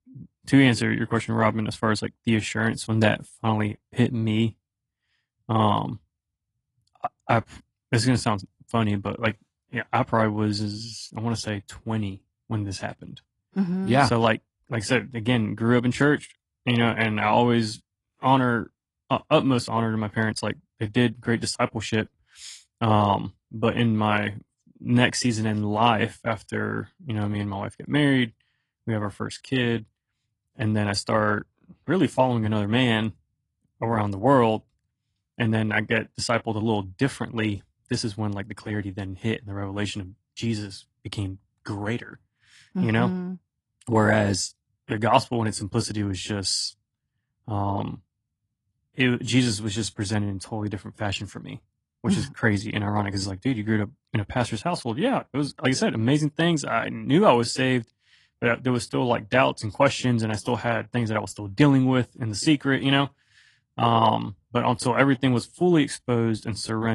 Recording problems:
garbled, watery; slightly
abrupt cut into speech; at the end

